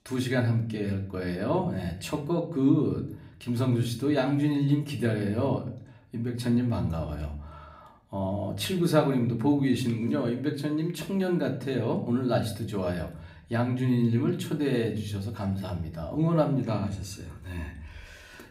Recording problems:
room echo; very slight; dies away in 0.5 s
off-mic speech; somewhat distant

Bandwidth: 15.5 kHz